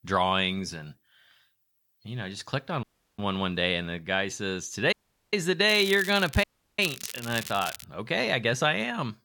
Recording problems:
crackling; noticeable; from 5.5 to 8 s; 10 dB below the speech
audio cutting out; at 3 s, at 5 s and at 6.5 s

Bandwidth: 18 kHz